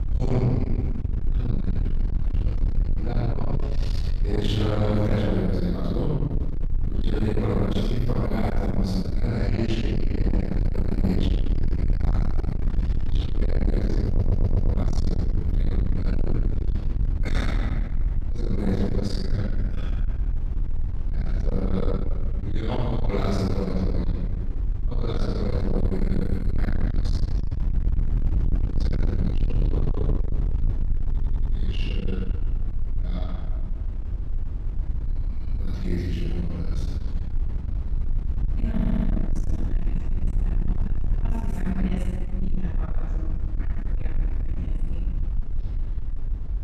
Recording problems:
distortion; heavy; 6 dB below the speech
room echo; strong; dies away in 1.6 s
off-mic speech; far
low rumble; loud; throughout; 8 dB below the speech
audio stuttering; at 14 s, at 31 s and at 39 s

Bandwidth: 13.5 kHz